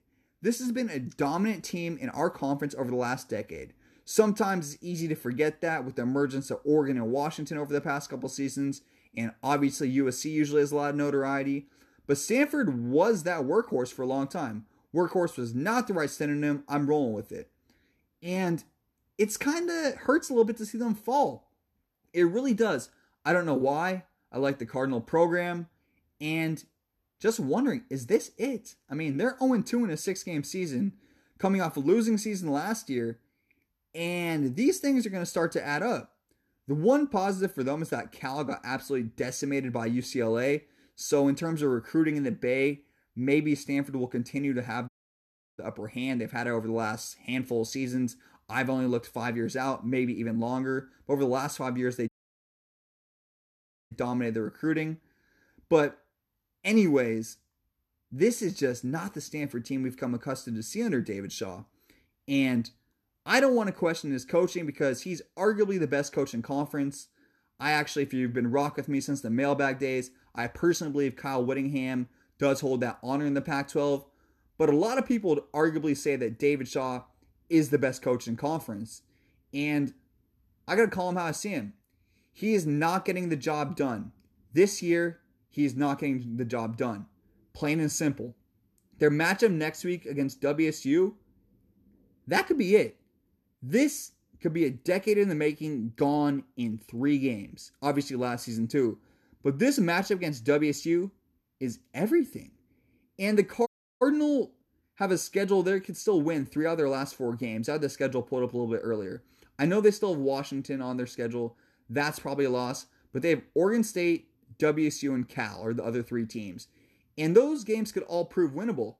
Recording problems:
audio cutting out; at 45 s for 0.5 s, at 52 s for 2 s and at 1:44

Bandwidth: 13.5 kHz